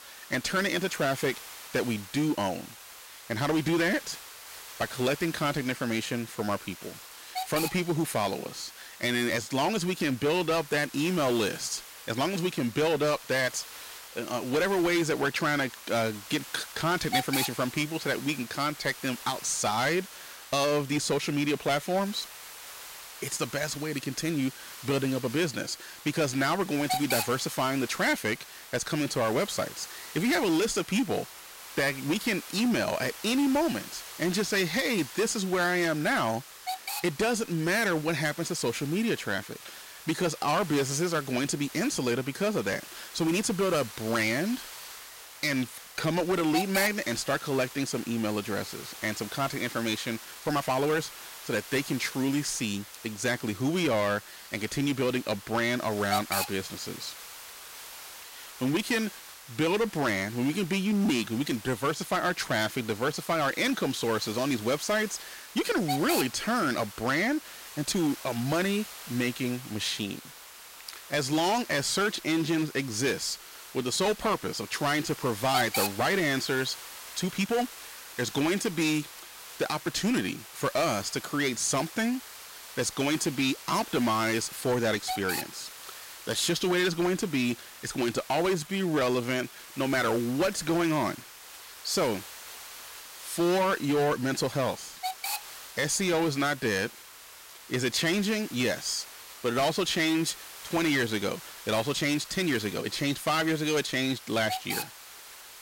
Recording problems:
distortion; slight; 8% of the sound clipped
hiss; noticeable; throughout; 10 dB below the speech
uneven, jittery; strongly; from 46 s to 1:43

